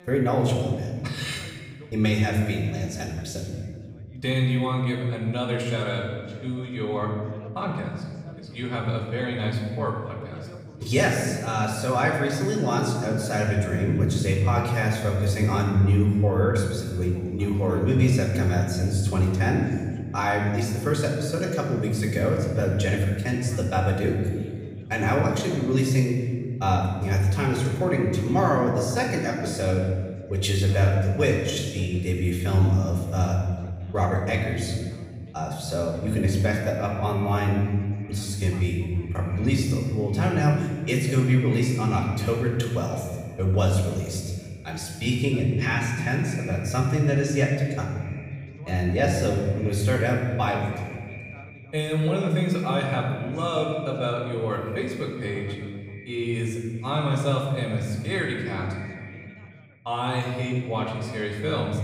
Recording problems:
off-mic speech; far
room echo; noticeable; dies away in 1.6 s
echo of what is said; faint; from 36 s on; 190 ms later, 20 dB below the speech
background chatter; faint; throughout; 3 voices, 25 dB below the speech

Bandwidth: 15.5 kHz